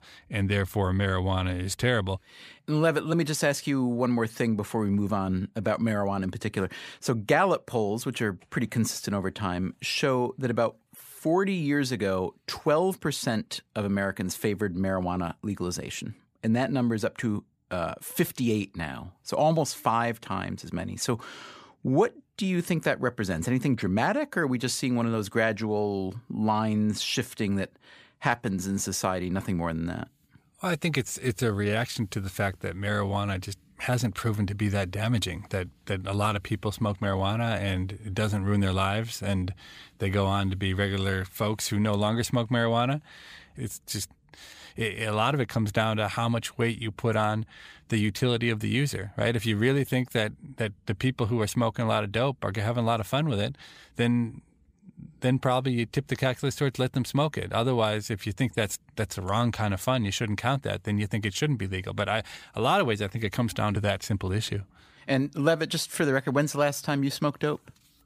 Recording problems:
none

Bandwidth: 15 kHz